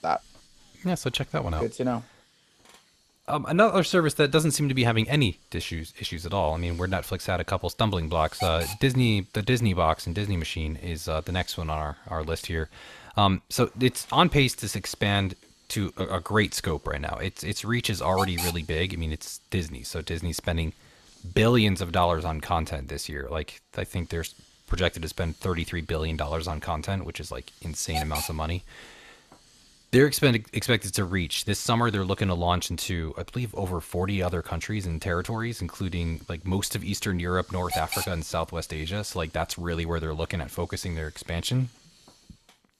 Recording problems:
hiss; noticeable; throughout; 10 dB below the speech

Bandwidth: 13.5 kHz